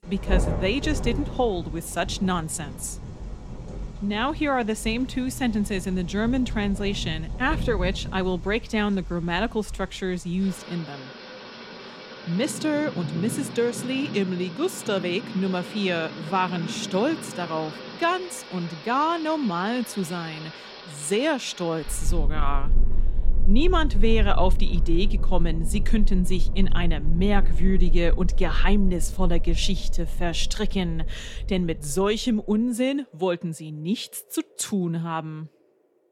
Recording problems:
rain or running water; loud; throughout; 6 dB below the speech

